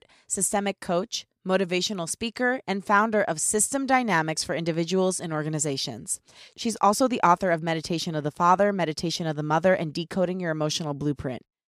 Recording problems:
none

